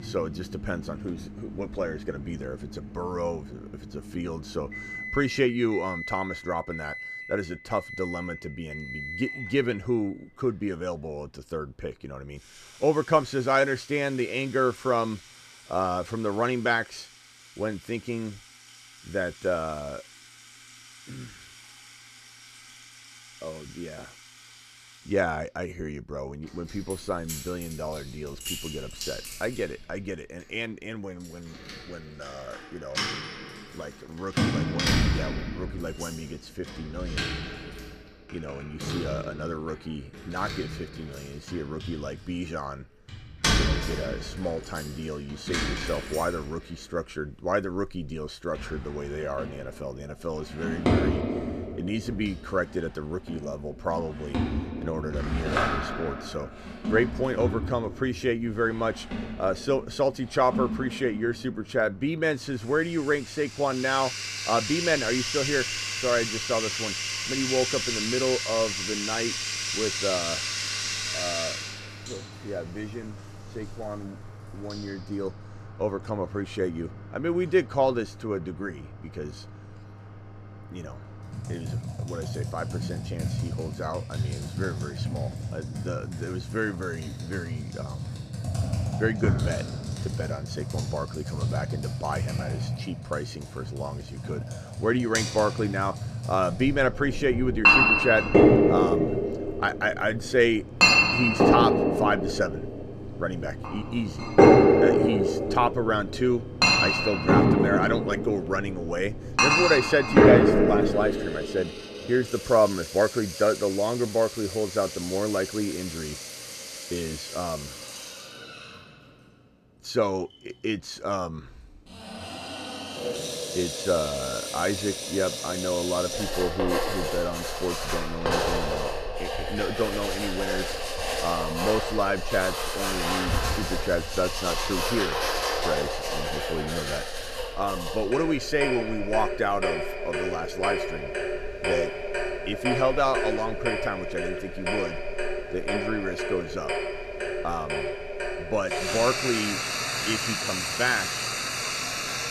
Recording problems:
household noises; very loud; throughout; 2 dB above the speech

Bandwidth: 14.5 kHz